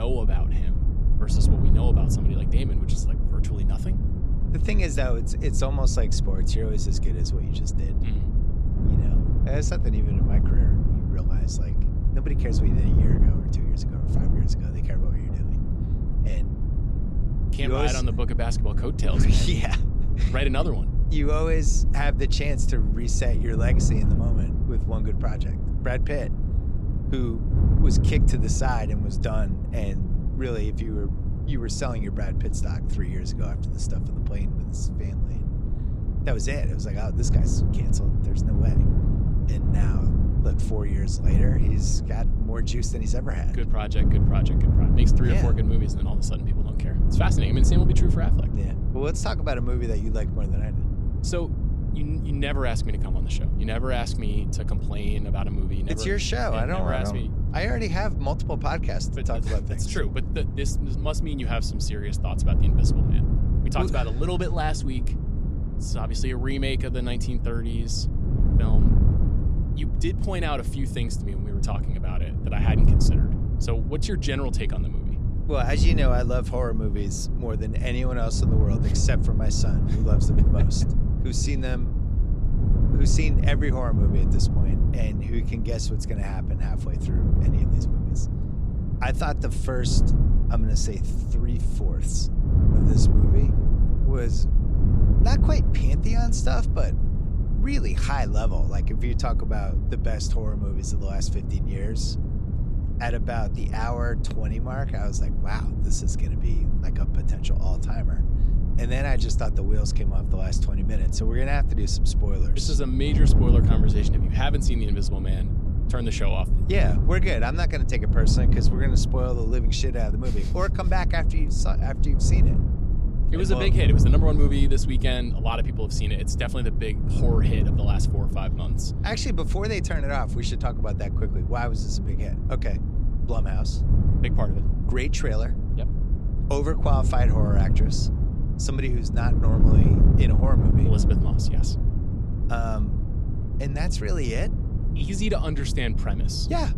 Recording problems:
wind noise on the microphone; heavy; 5 dB below the speech
low rumble; faint; throughout; 25 dB below the speech
abrupt cut into speech; at the start

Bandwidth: 15 kHz